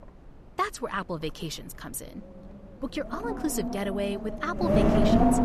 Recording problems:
wind noise on the microphone; heavy; 4 dB above the speech

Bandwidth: 13.5 kHz